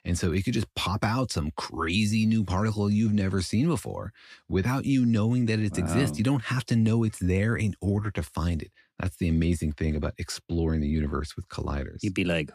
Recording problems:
none

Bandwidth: 14.5 kHz